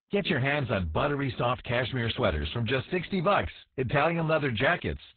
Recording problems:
garbled, watery; badly; nothing above 4 kHz

